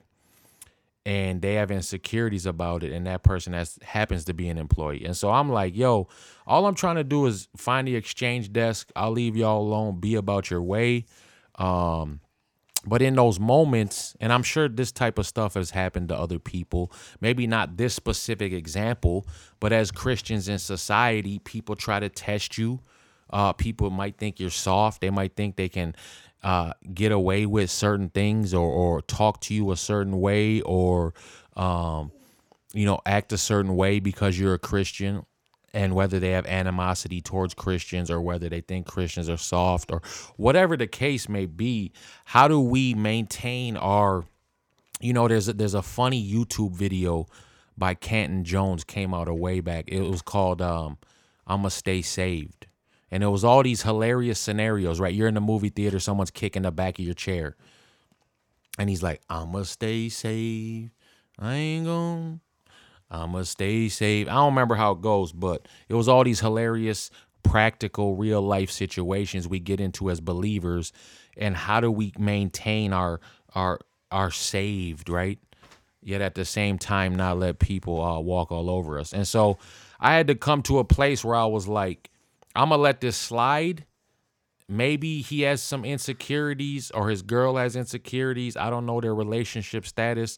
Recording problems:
none

